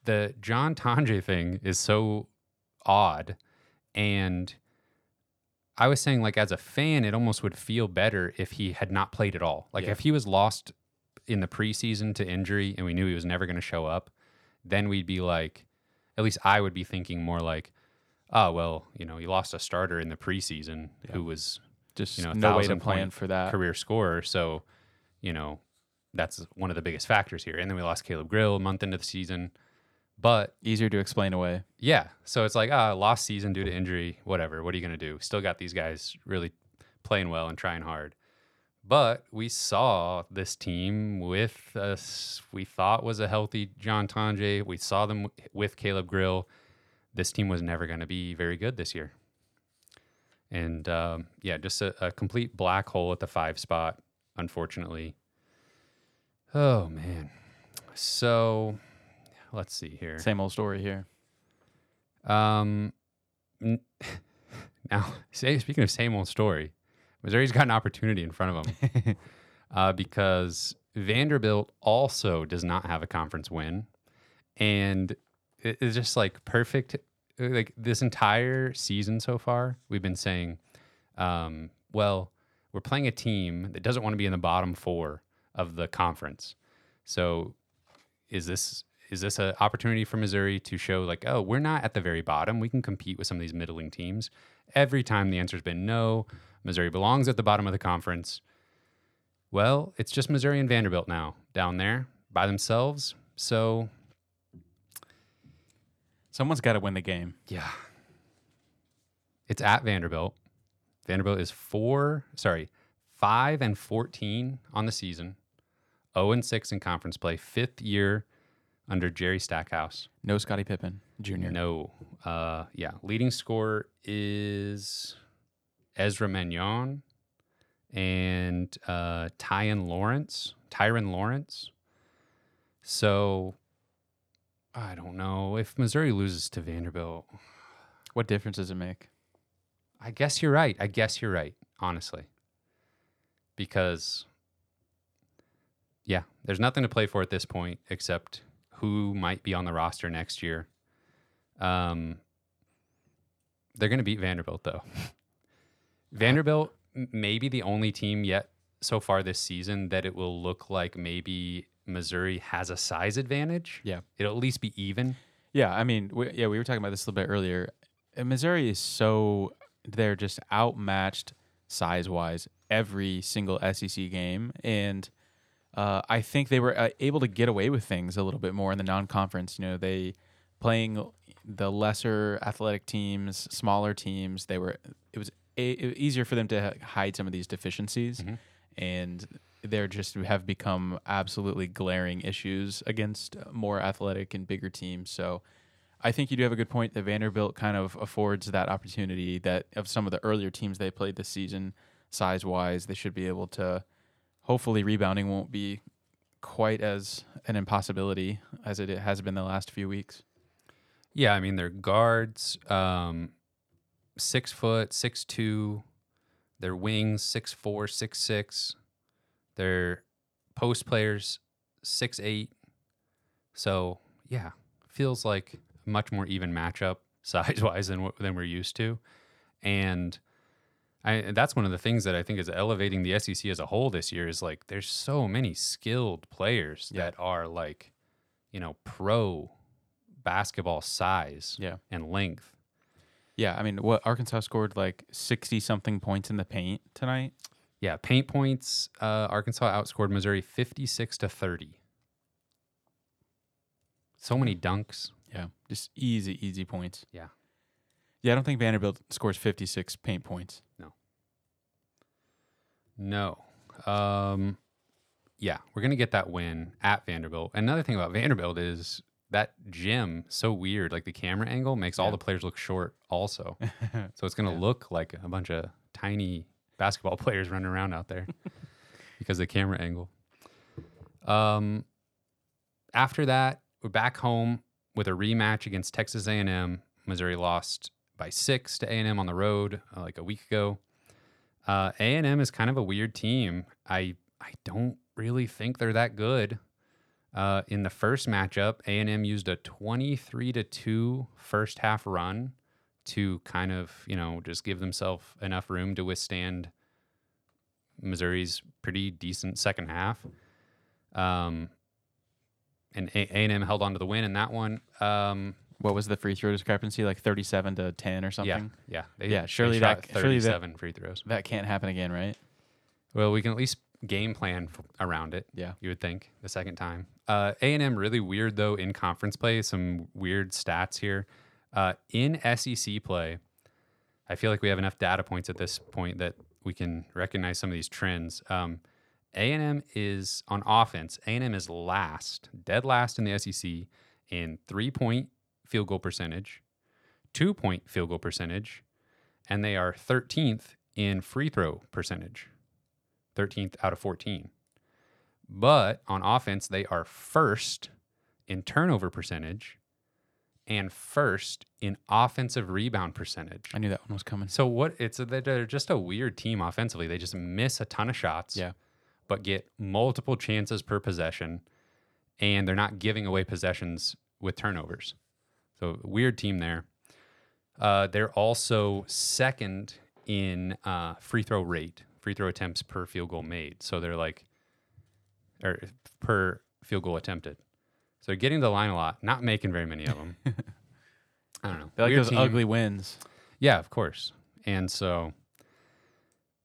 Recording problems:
none

